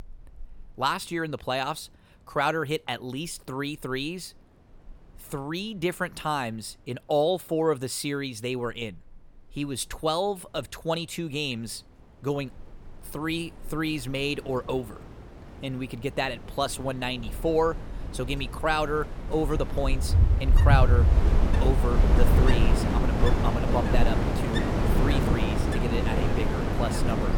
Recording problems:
wind in the background; very loud; throughout; 4 dB above the speech

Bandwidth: 17 kHz